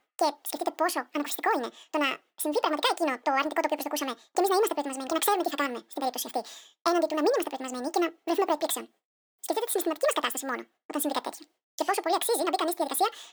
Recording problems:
wrong speed and pitch; too fast and too high; 1.7 times normal speed

